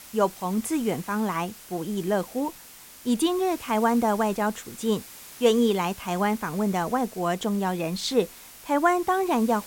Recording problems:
hiss; noticeable; throughout; 15 dB below the speech

